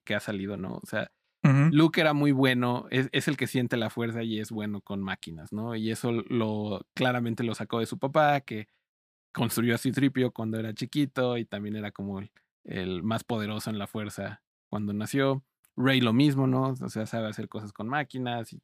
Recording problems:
none

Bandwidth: 15 kHz